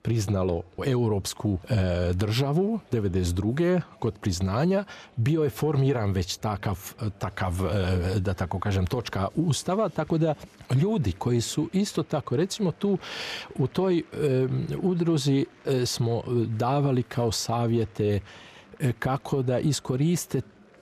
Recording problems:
murmuring crowd; faint; throughout; 30 dB below the speech

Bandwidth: 14 kHz